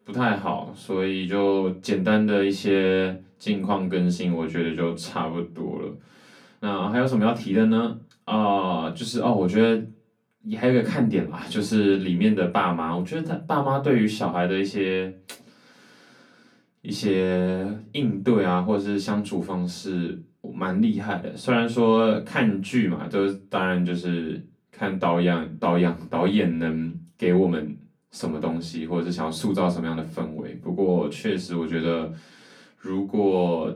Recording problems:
off-mic speech; far
room echo; very slight; dies away in 0.2 s

